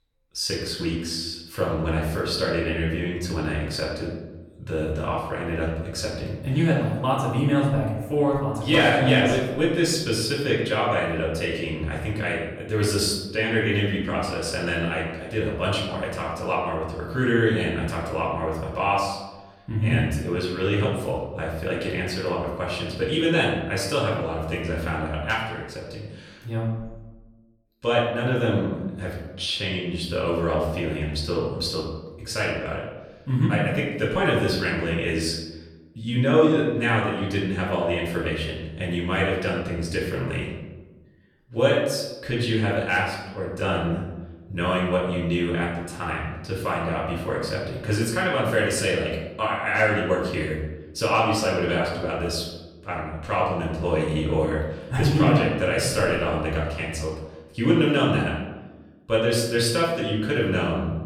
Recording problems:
off-mic speech; far
room echo; noticeable; dies away in 1 s

